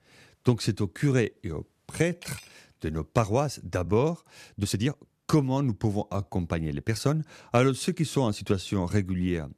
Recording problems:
uneven, jittery; strongly; from 1 to 8.5 s
clattering dishes; faint; at 2 s; peak 20 dB below the speech

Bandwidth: 14.5 kHz